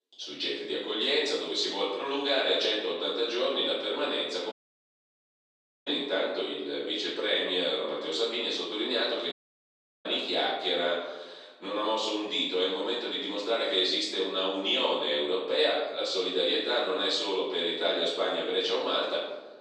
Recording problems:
off-mic speech; far
room echo; noticeable; dies away in 0.9 s
thin; somewhat; fading below 350 Hz
audio cutting out; at 4.5 s for 1.5 s and at 9.5 s for 0.5 s

